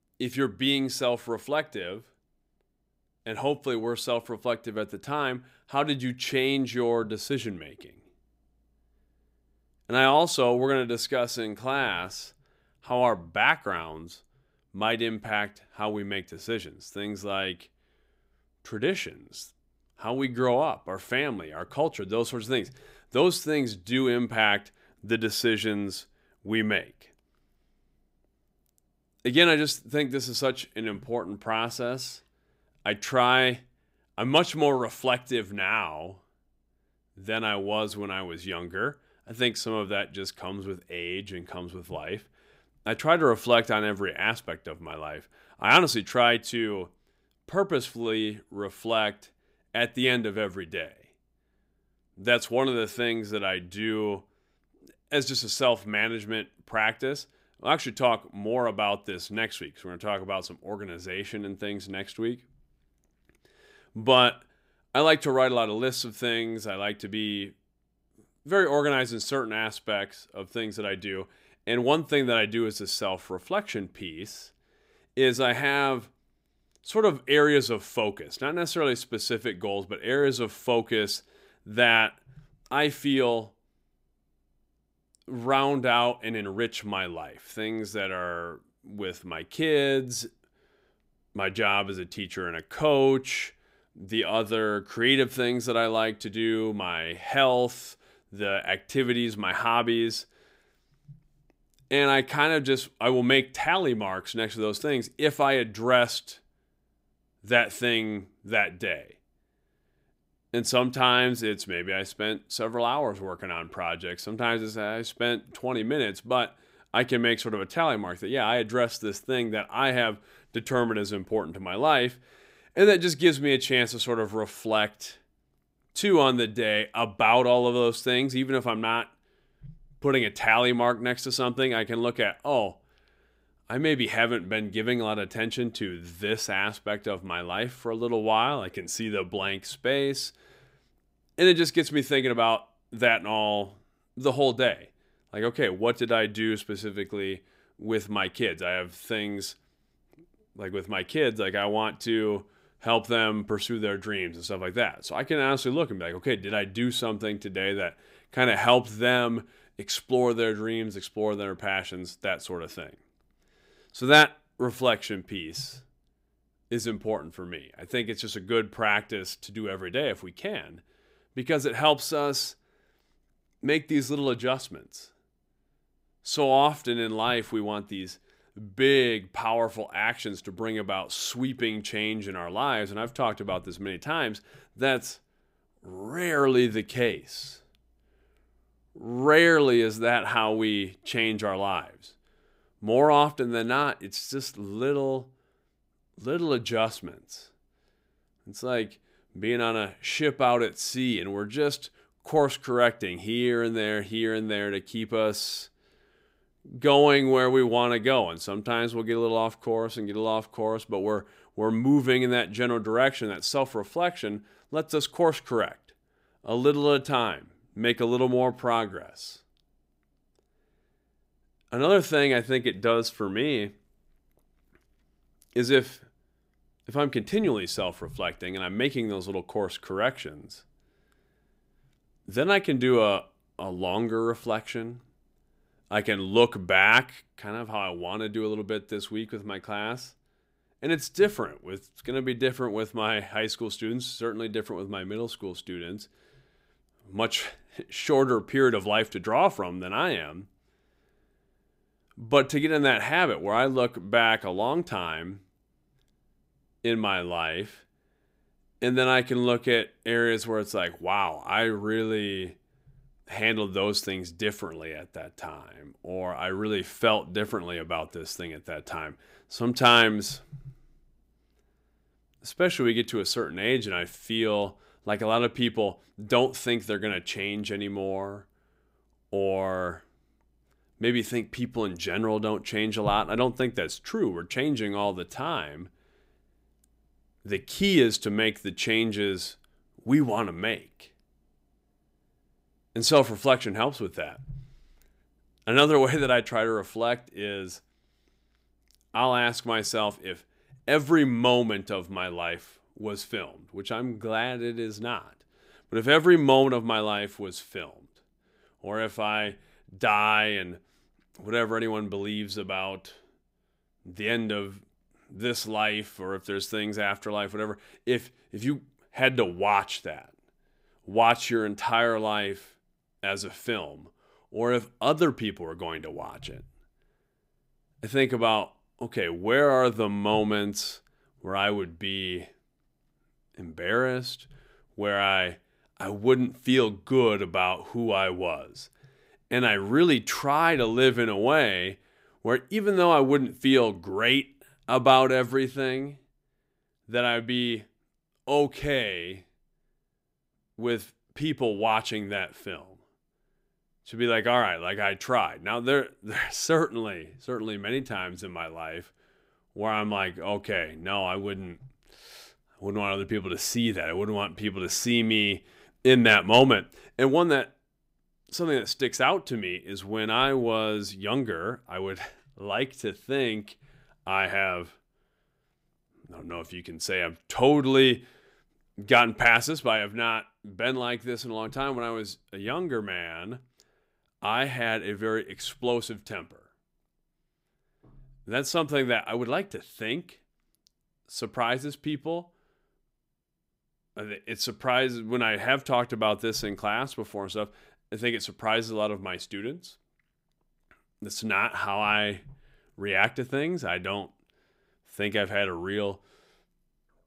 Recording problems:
none

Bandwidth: 15.5 kHz